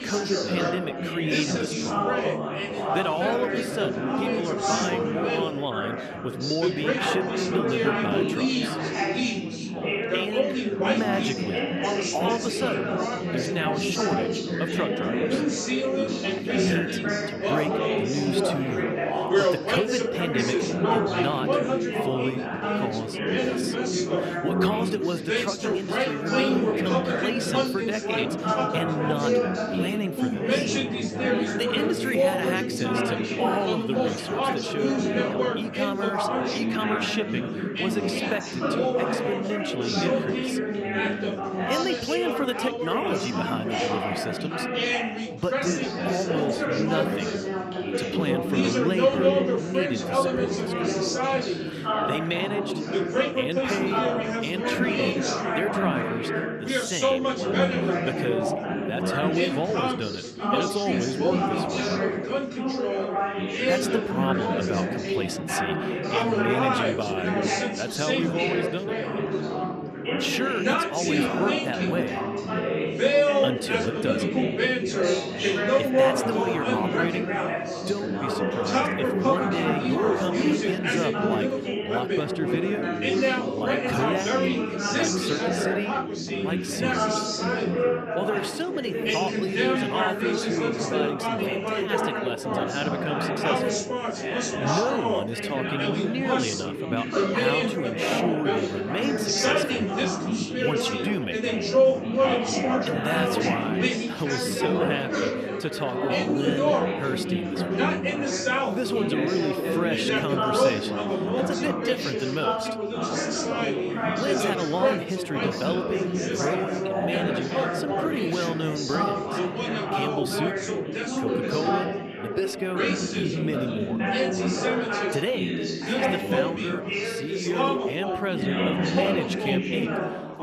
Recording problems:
chatter from many people; very loud; throughout; 5 dB above the speech

